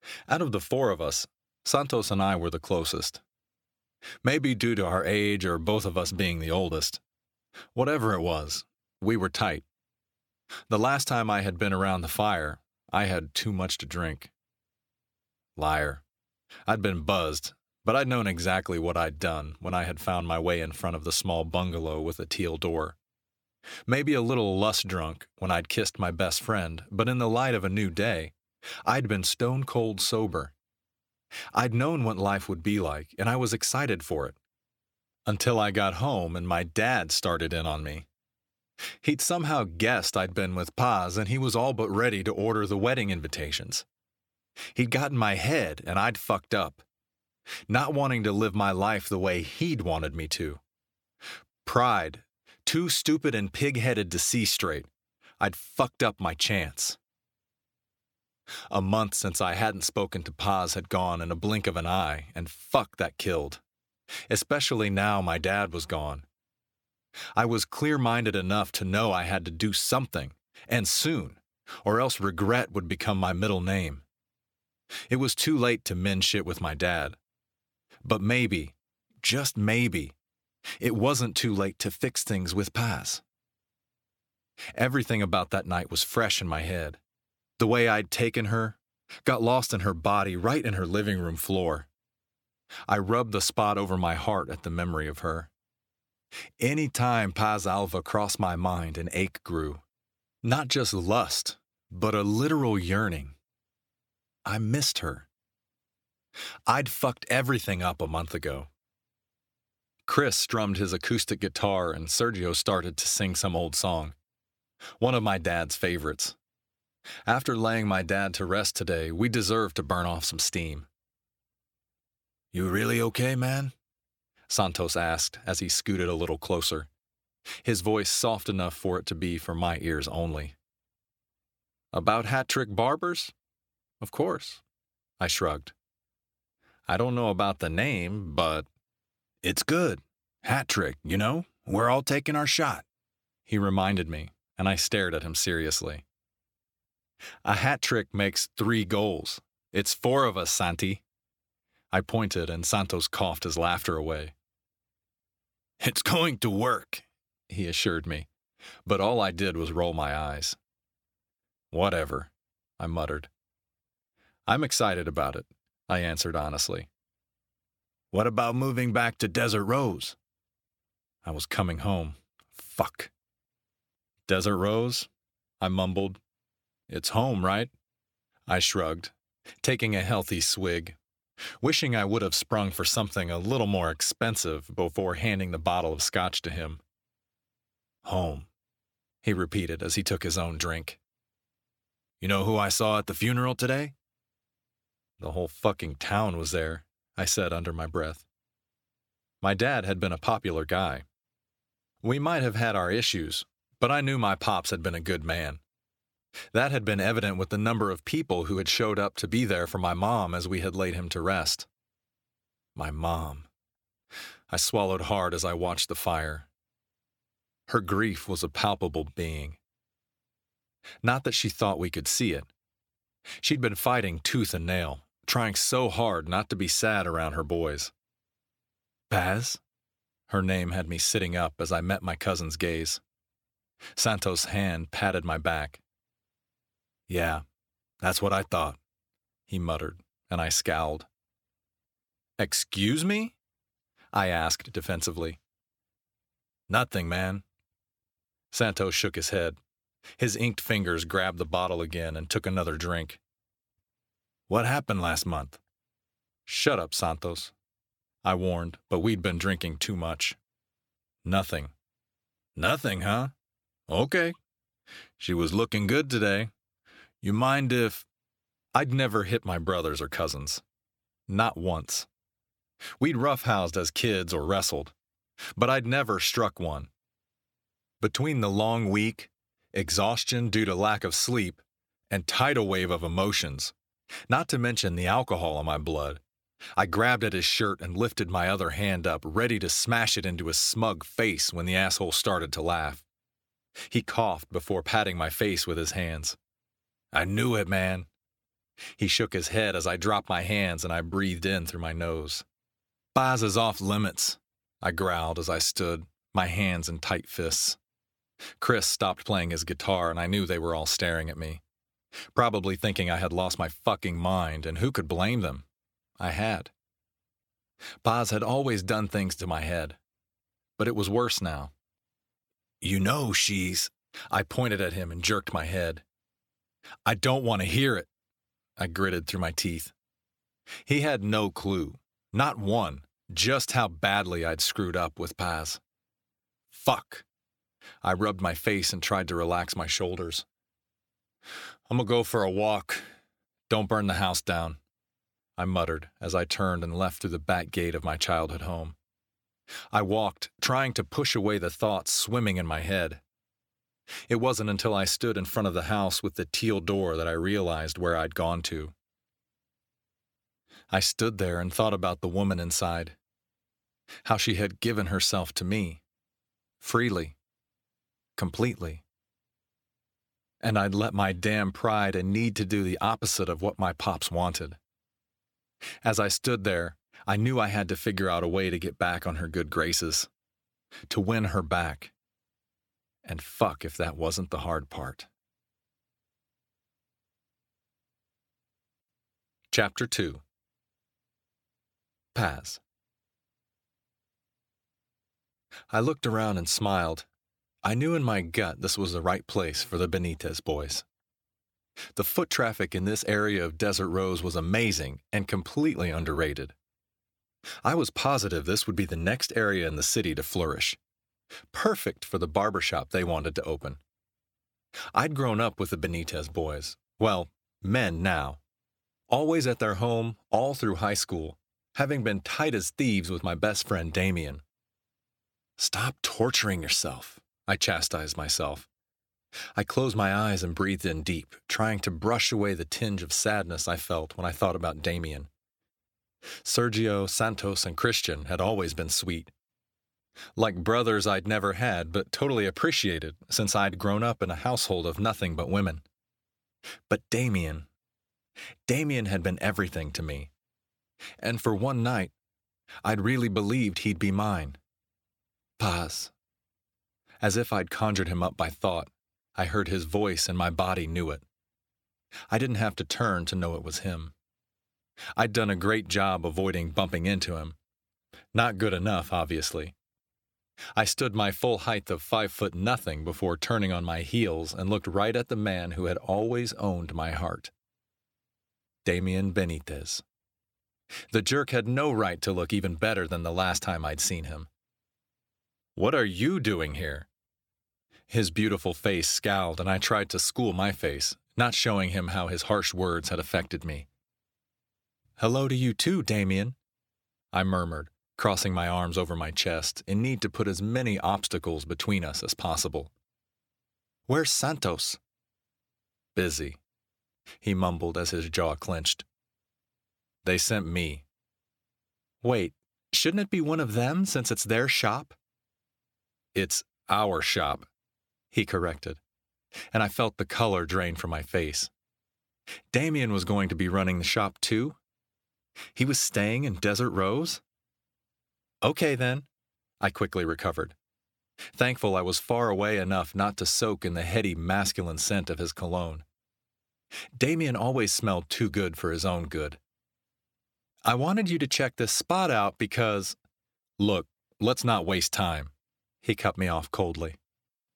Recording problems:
none

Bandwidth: 17.5 kHz